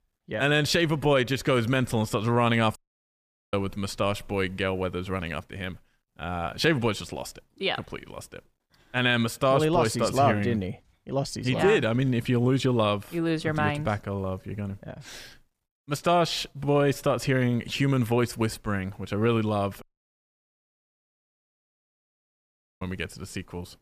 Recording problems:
audio cutting out; at 3 s for 1 s and at 20 s for 3 s

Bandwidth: 15 kHz